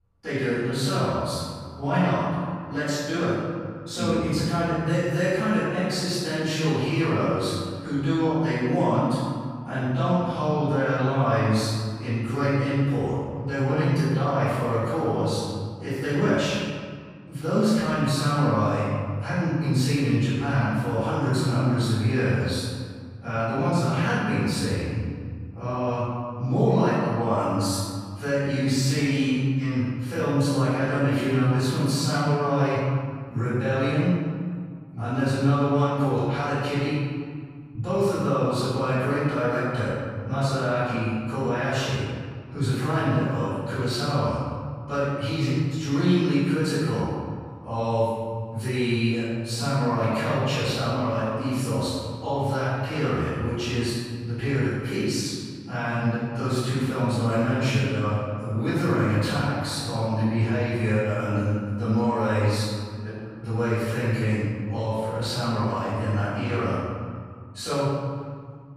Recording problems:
room echo; strong; dies away in 1.8 s
off-mic speech; far

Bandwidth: 15.5 kHz